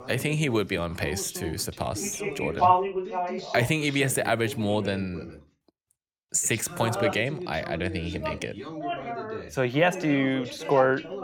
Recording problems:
background chatter; loud; throughout; 2 voices, 5 dB below the speech

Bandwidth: 19 kHz